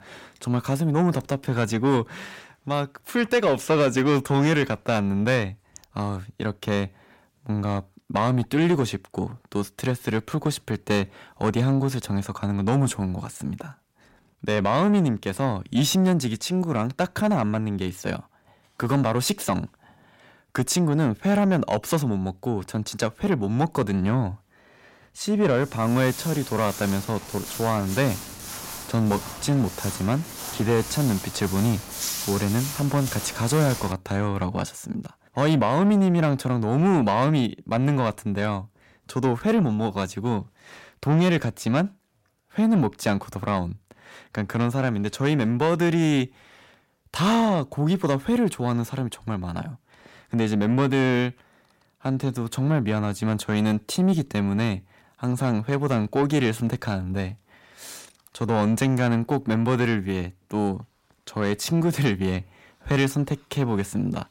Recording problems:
distortion; slight; 10 dB below the speech
footsteps; noticeable; from 26 to 34 s; peak 2 dB below the speech

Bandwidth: 16 kHz